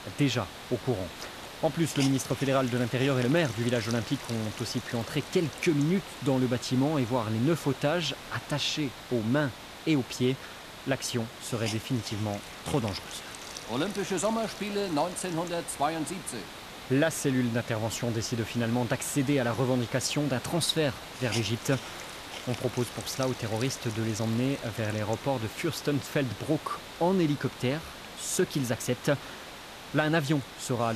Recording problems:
hiss; noticeable; throughout; 10 dB below the speech
abrupt cut into speech; at the end

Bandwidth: 14.5 kHz